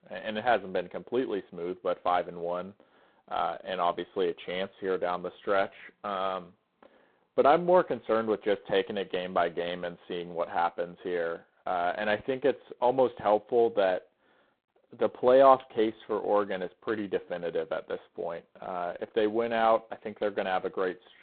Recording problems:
phone-call audio; poor line; nothing above 3.5 kHz

